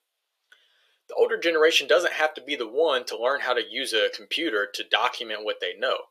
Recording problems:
thin; very; fading below 450 Hz

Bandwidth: 14.5 kHz